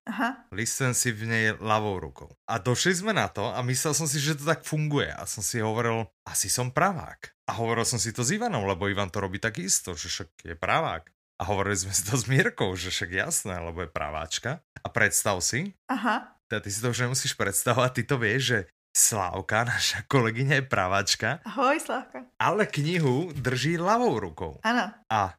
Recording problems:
none

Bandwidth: 15 kHz